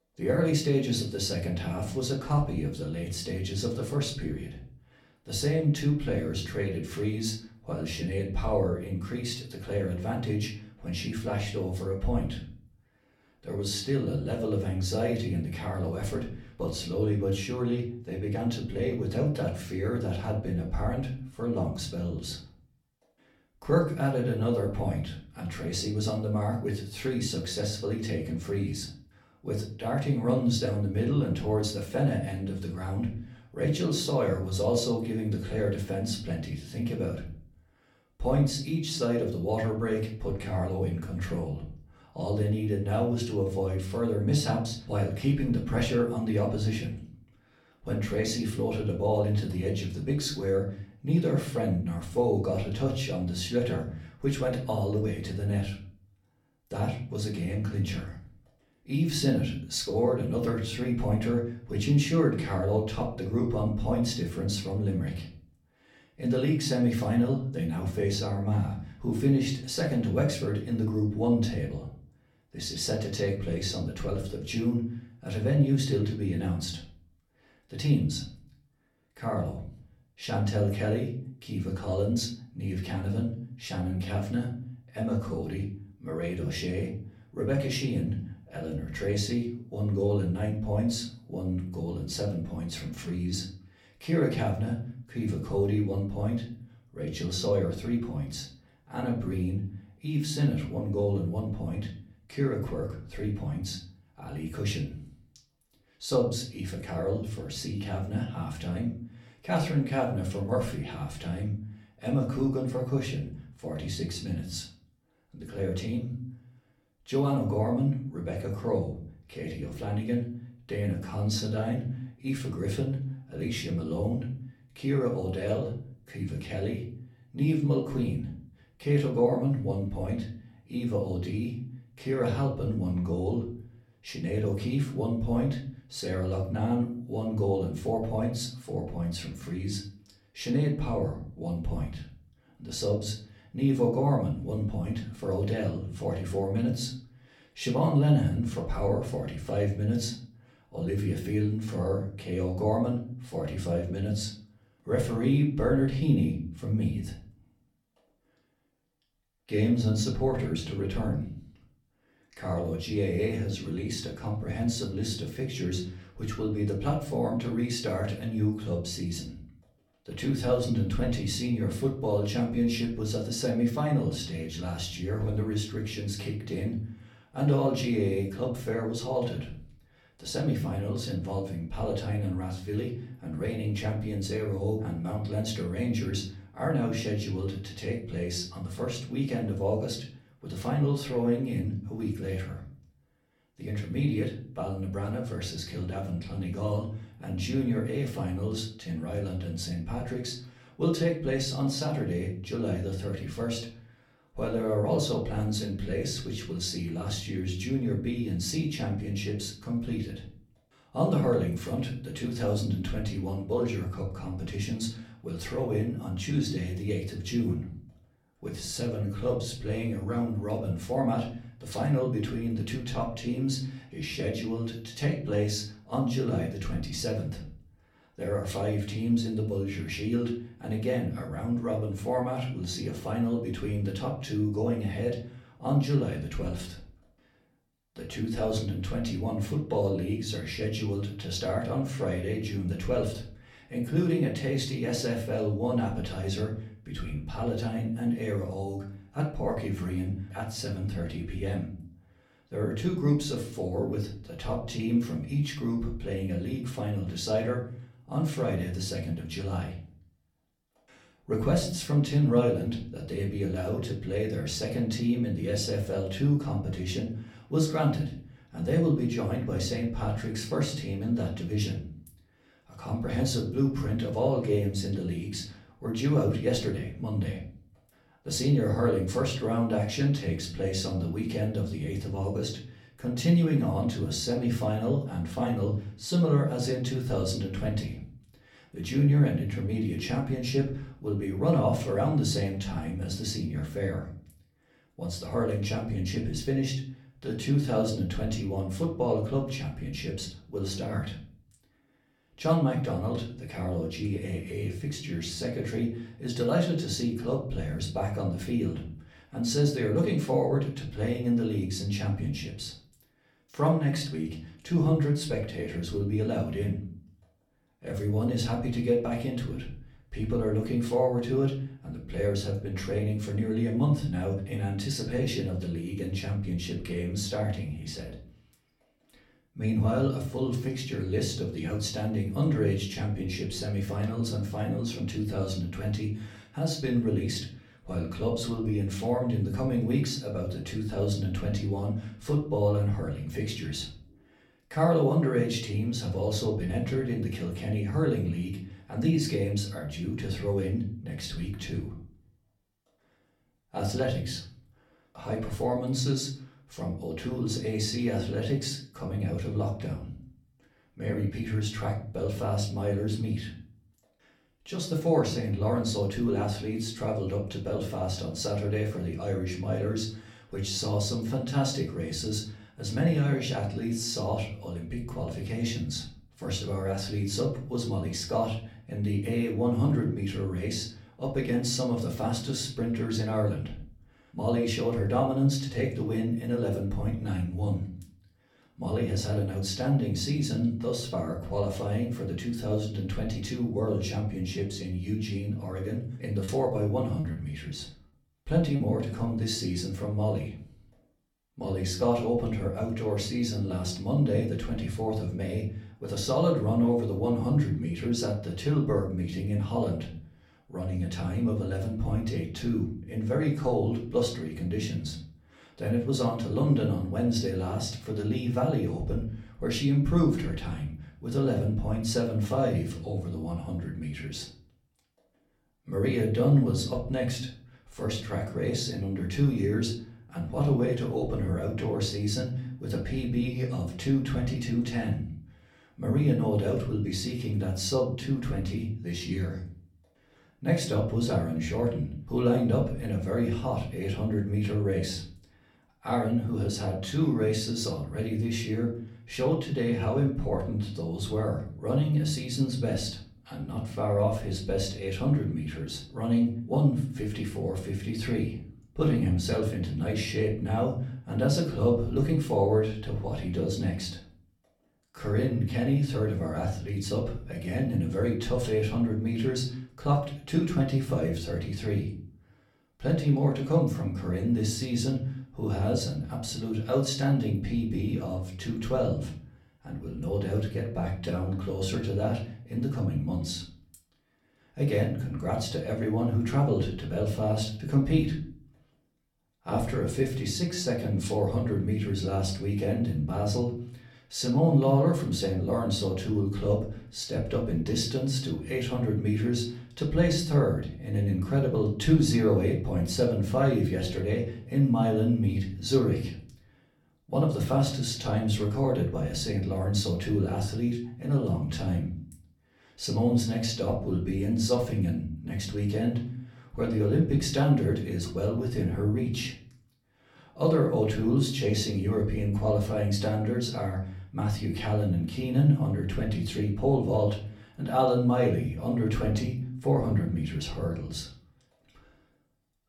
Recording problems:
off-mic speech; far
room echo; slight; dies away in 0.5 s
choppy; very; from 6:36 to 6:39; 8% of the speech affected

